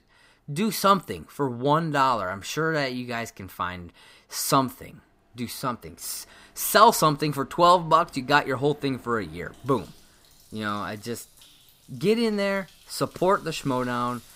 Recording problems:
household noises; faint; throughout; 30 dB below the speech

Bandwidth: 15.5 kHz